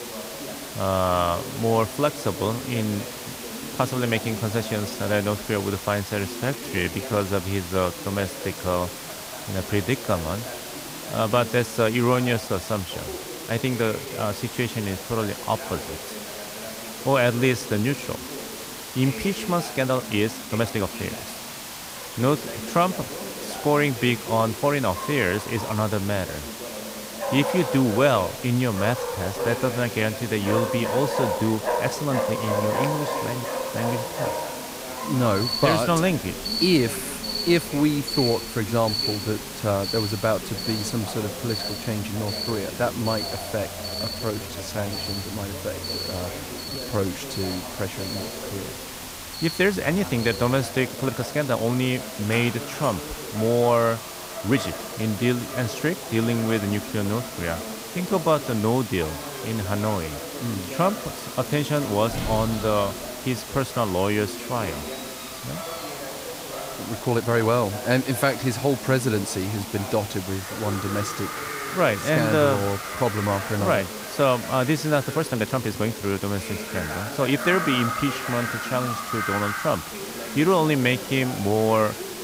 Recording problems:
animal sounds; loud; throughout; 8 dB below the speech
hiss; loud; throughout; 10 dB below the speech
voice in the background; noticeable; throughout; 15 dB below the speech
crackling; faint; from 1:01 to 1:02; 20 dB below the speech
uneven, jittery; strongly; from 6.5 s to 1:17

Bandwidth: 15.5 kHz